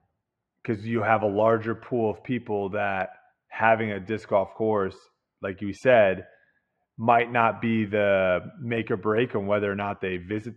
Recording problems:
muffled; very; fading above 1.5 kHz

